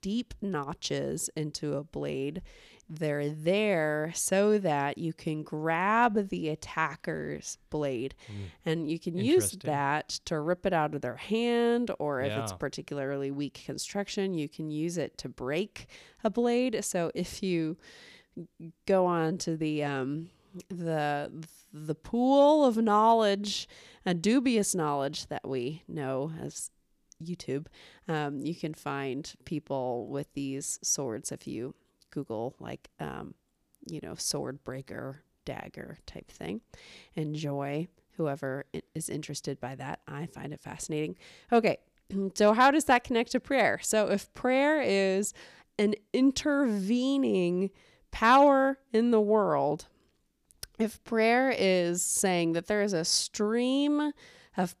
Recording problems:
none

